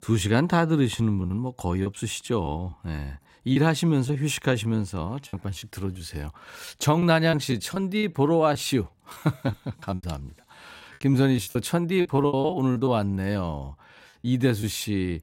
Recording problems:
choppy; very; 9% of the speech affected

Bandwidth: 16 kHz